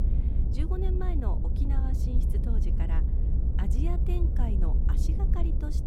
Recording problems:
low rumble; loud; throughout; 2 dB below the speech

